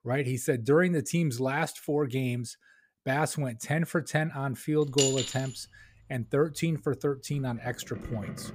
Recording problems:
household noises; loud; from 4.5 s on; 4 dB below the speech

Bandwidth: 15.5 kHz